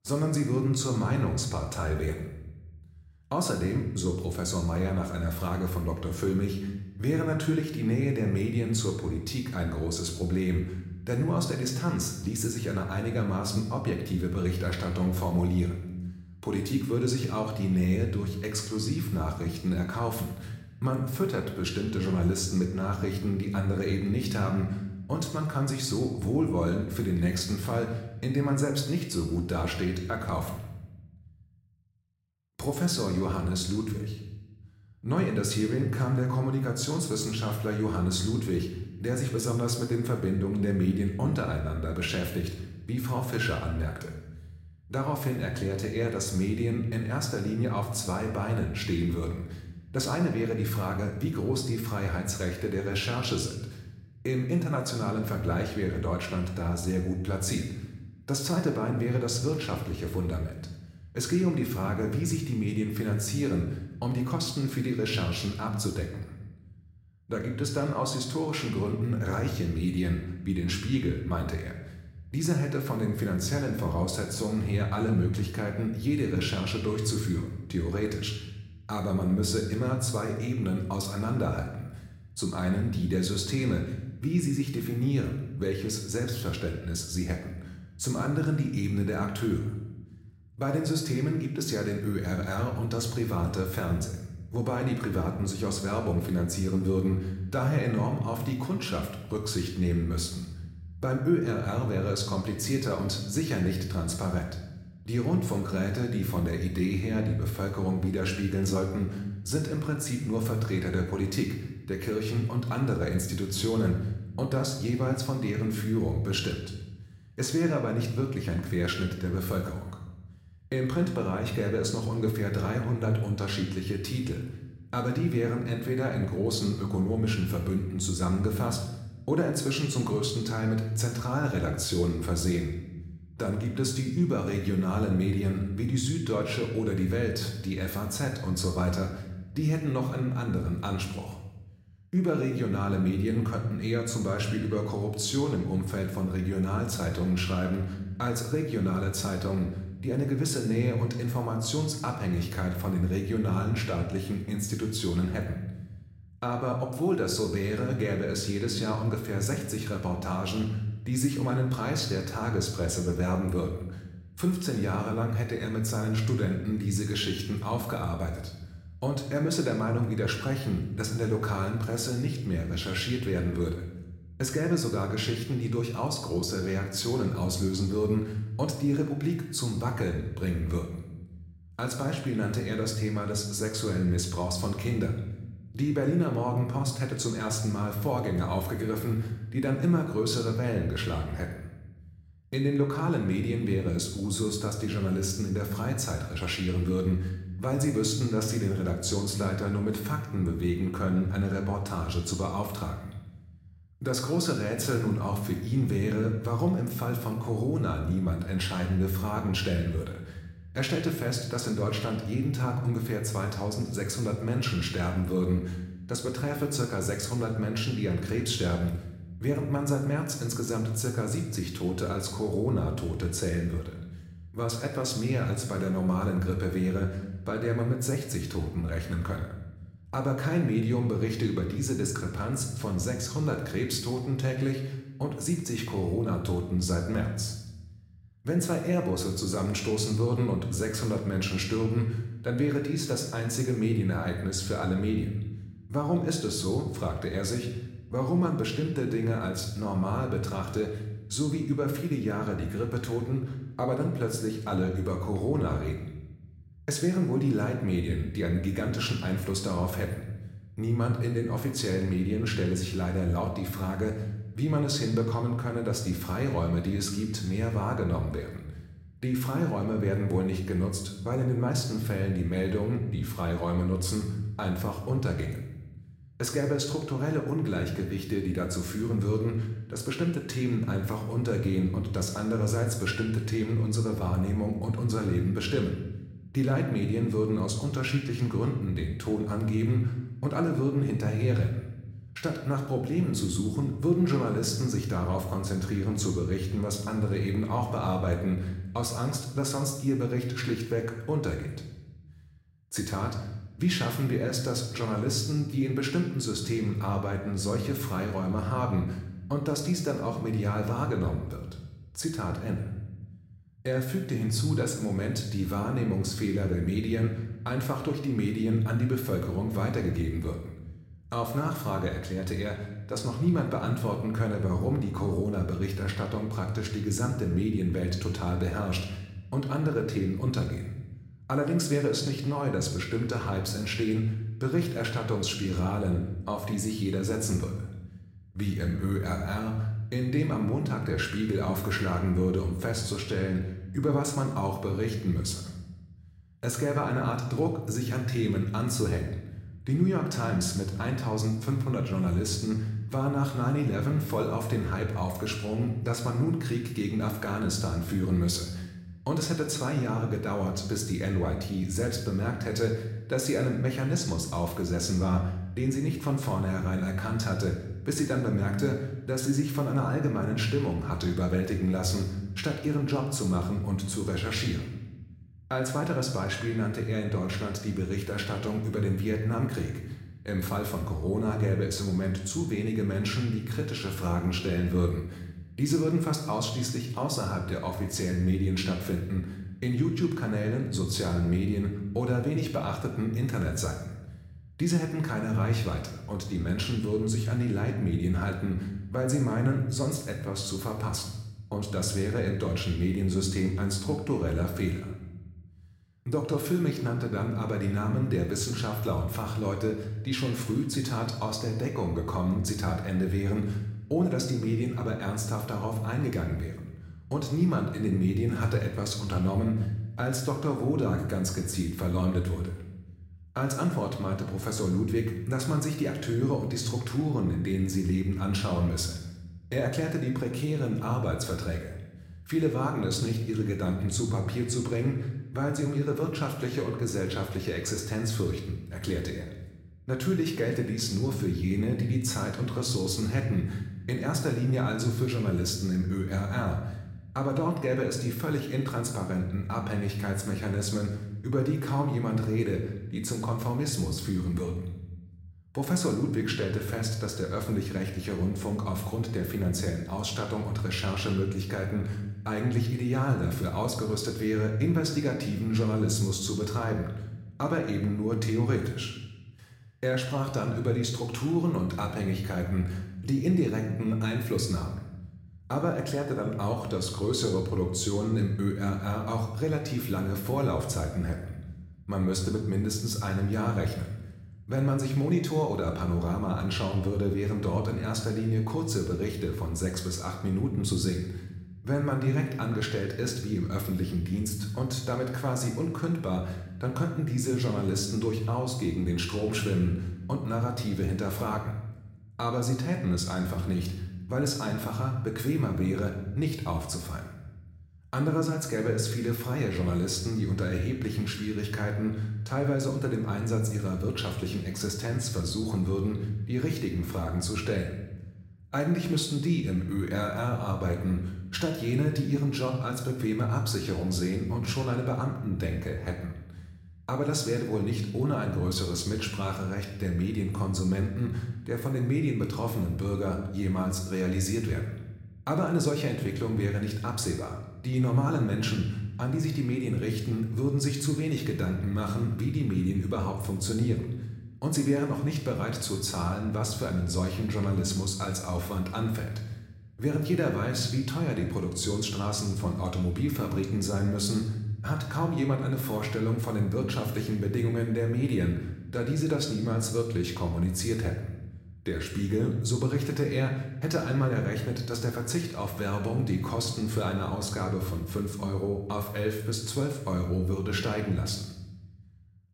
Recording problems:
room echo; slight; dies away in 0.9 s
off-mic speech; somewhat distant

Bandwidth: 16 kHz